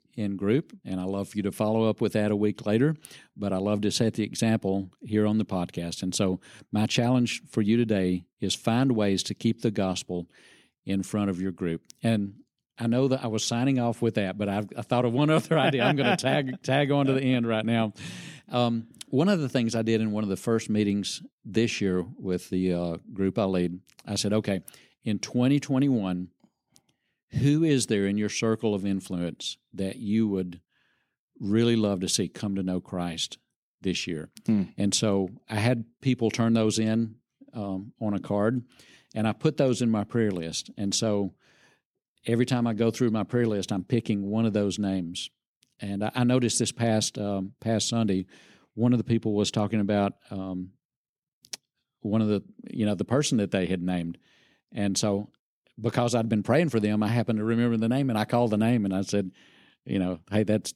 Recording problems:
none

